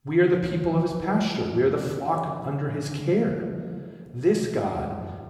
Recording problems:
room echo; noticeable; dies away in 1.4 s
off-mic speech; somewhat distant

